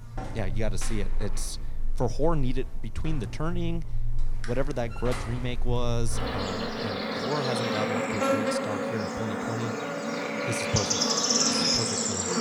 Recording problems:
animal sounds; very loud; throughout; 4 dB above the speech

